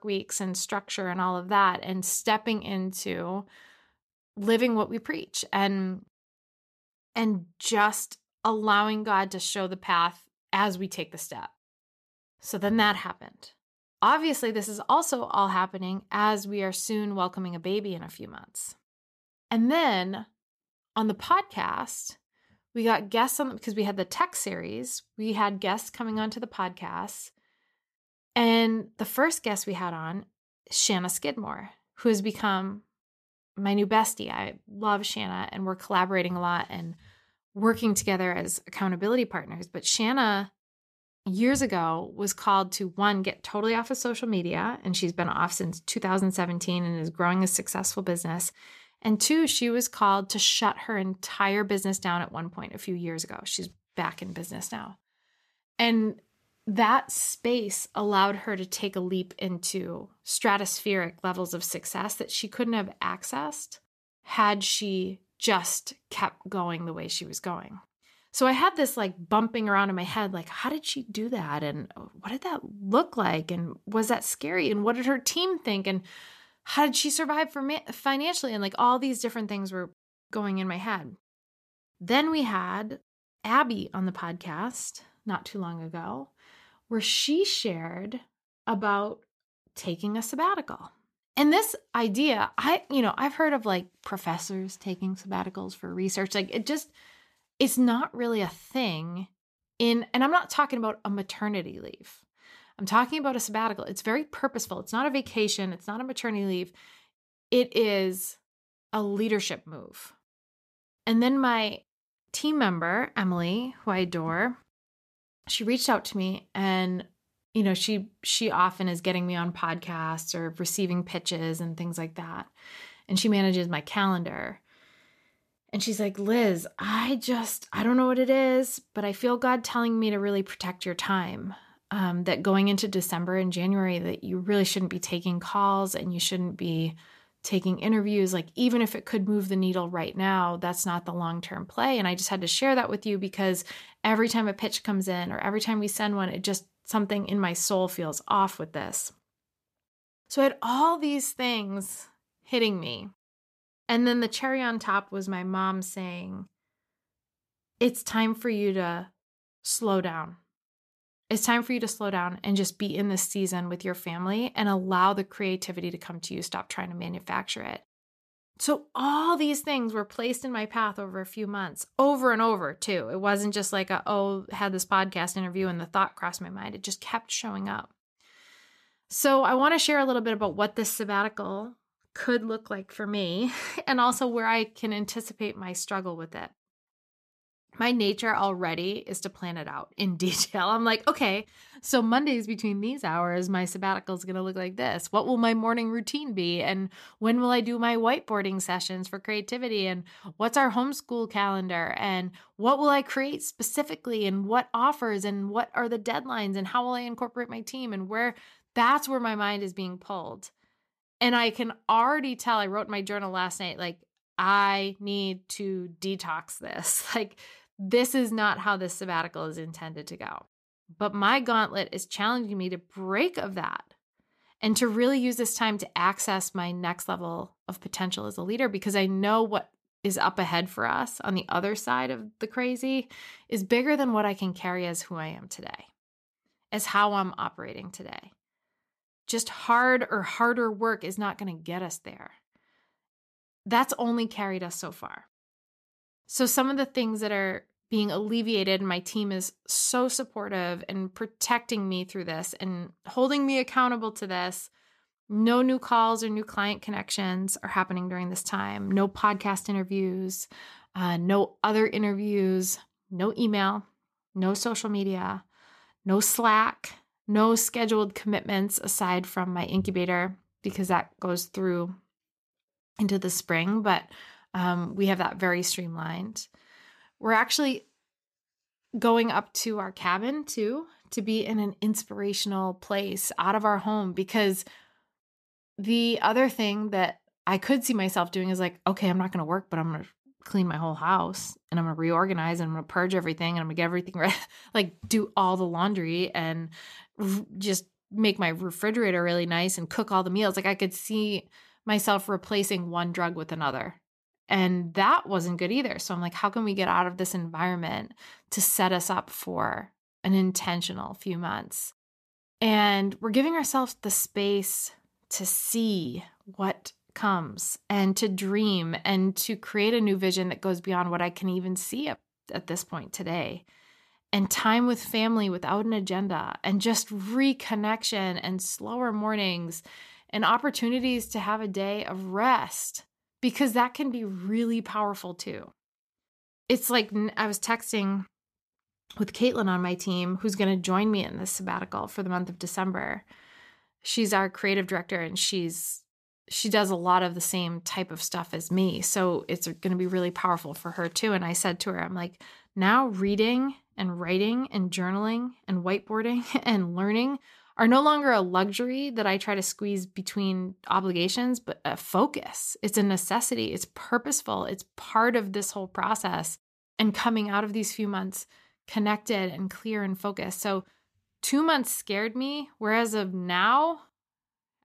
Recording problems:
none

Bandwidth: 14.5 kHz